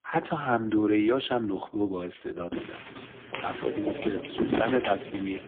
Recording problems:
phone-call audio; poor line
footsteps; loud; from 2.5 s on; peak 1 dB above the speech

